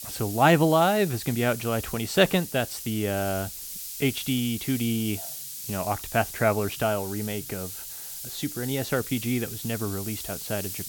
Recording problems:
hiss; loud; throughout; 8 dB below the speech

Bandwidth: 17 kHz